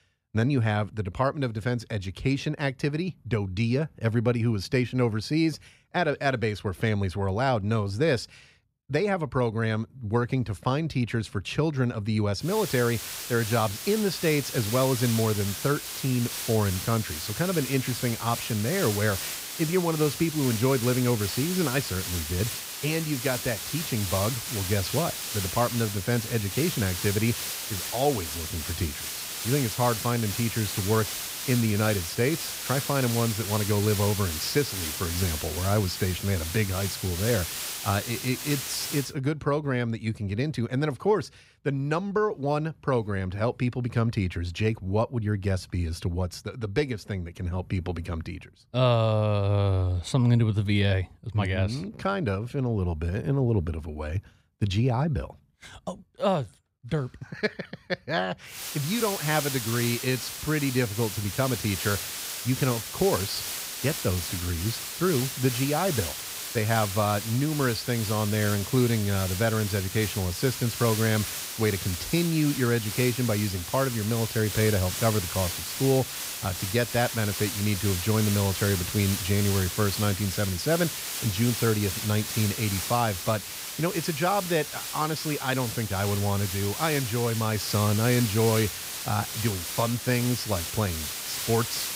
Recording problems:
hiss; loud; from 12 to 39 s and from 59 s on; 4 dB below the speech

